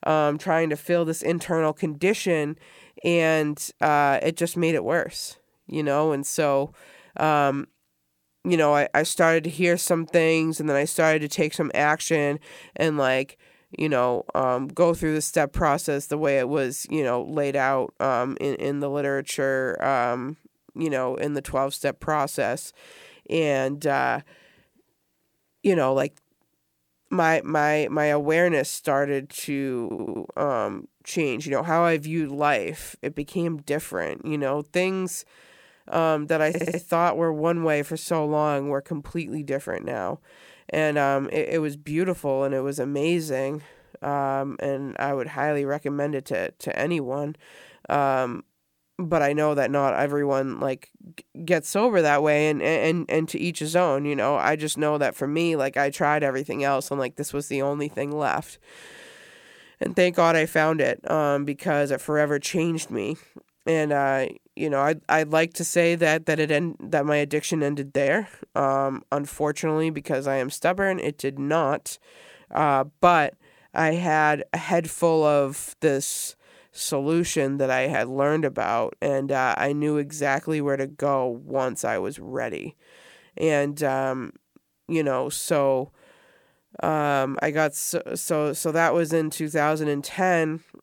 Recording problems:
audio stuttering; at 30 s and at 36 s

